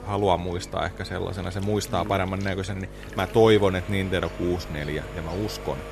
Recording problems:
electrical hum; noticeable; throughout; 50 Hz, 15 dB below the speech
household noises; noticeable; throughout; 20 dB below the speech

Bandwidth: 13.5 kHz